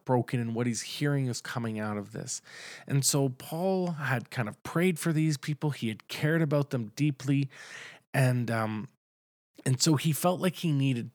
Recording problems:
none

